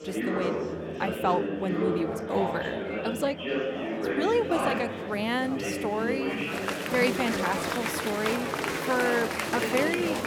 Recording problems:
chatter from many people; loud; throughout; as loud as the speech

